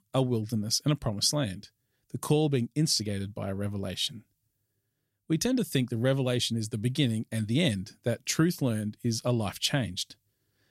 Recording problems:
none

